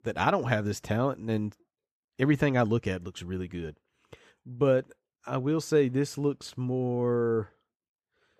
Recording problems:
none

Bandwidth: 14.5 kHz